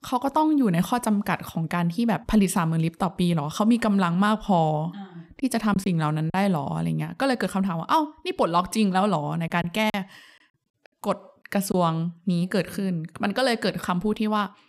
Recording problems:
choppy; very; at 5.5 s and from 9.5 to 12 s; 8% of the speech affected

